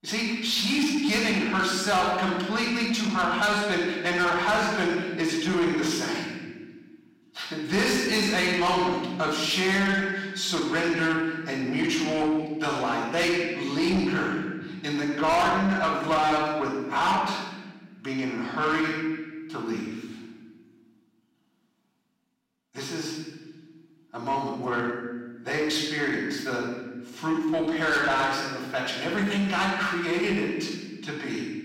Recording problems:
distortion; heavy; 8 dB below the speech
off-mic speech; far
room echo; noticeable; dies away in 1.1 s

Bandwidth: 16 kHz